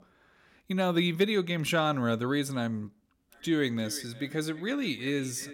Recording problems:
echo of what is said; faint; from 3.5 s on; 360 ms later, 20 dB below the speech

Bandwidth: 16.5 kHz